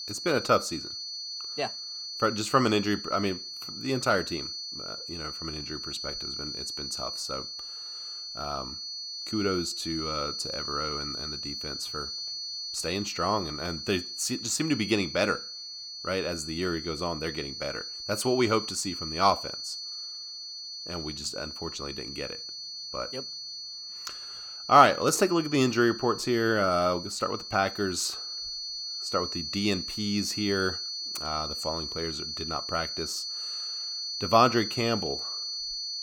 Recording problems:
high-pitched whine; loud; throughout; 4.5 kHz, 6 dB below the speech

